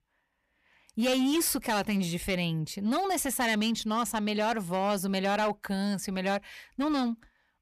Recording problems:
distortion; slight; 9% of the sound clipped

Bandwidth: 14.5 kHz